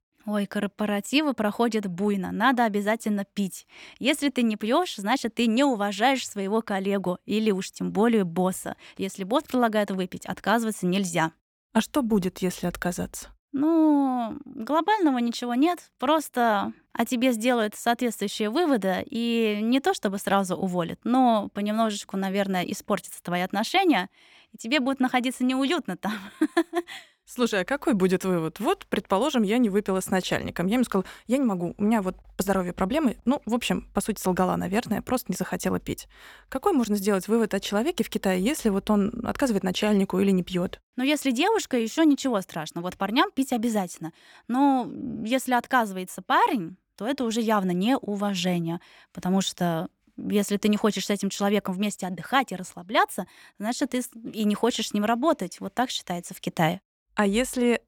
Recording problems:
none

